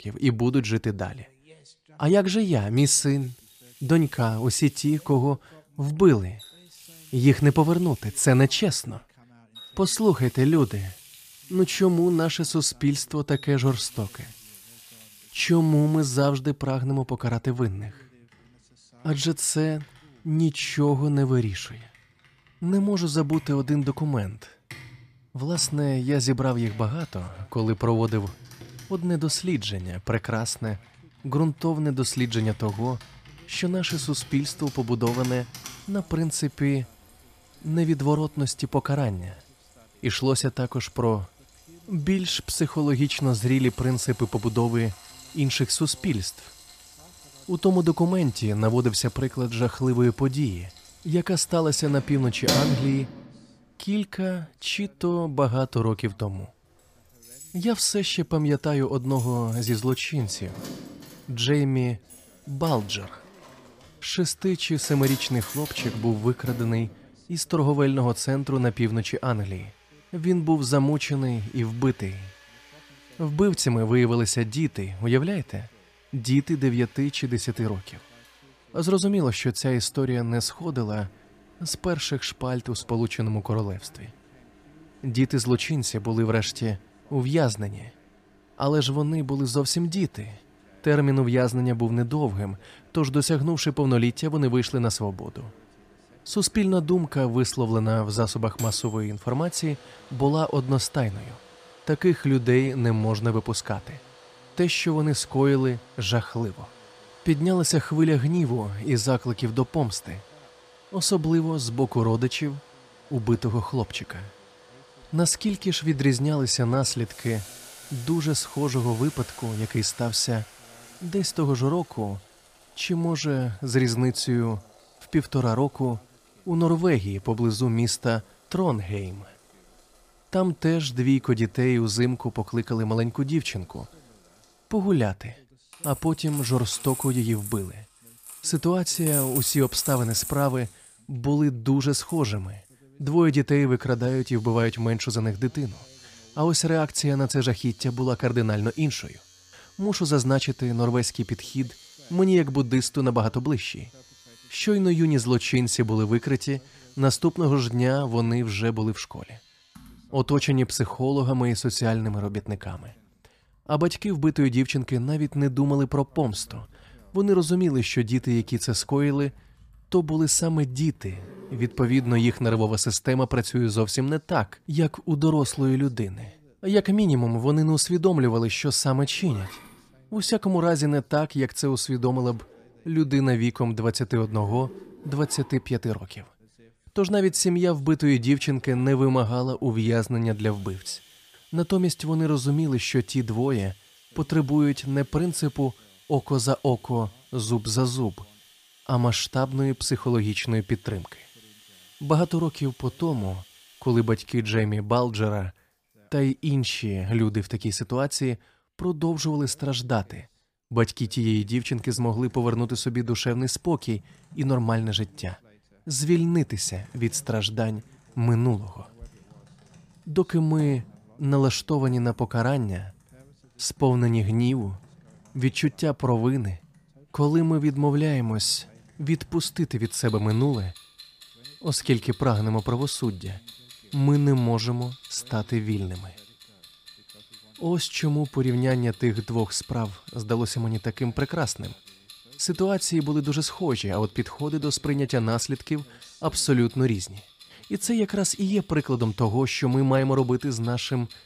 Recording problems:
household noises; noticeable; throughout; 15 dB below the speech

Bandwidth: 15 kHz